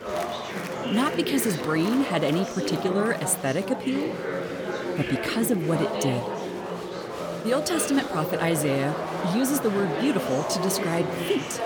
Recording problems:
chatter from many people; loud; throughout; 4 dB below the speech

